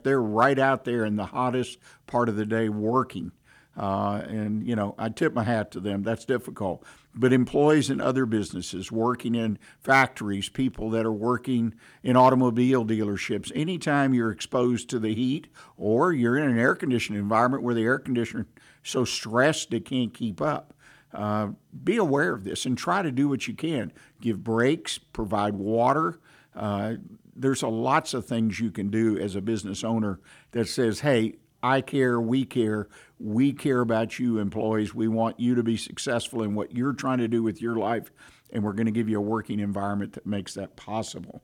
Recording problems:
none

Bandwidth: 18 kHz